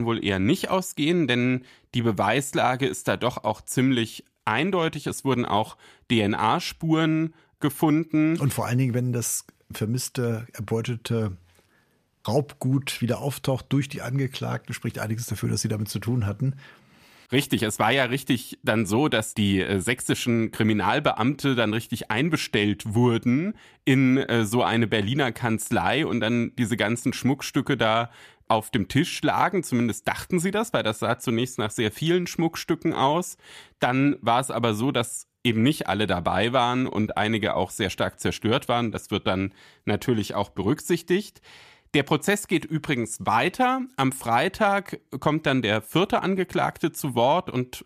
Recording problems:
abrupt cut into speech; at the start

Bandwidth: 14.5 kHz